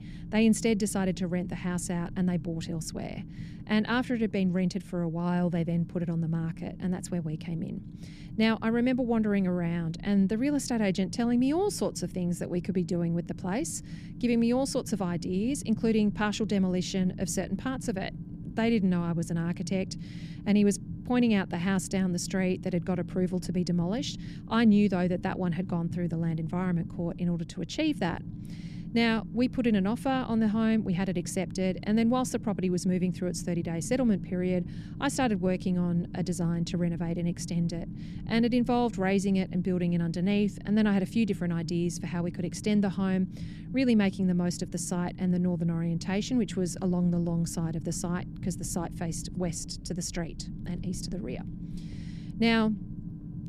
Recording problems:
low rumble; noticeable; throughout; 15 dB below the speech

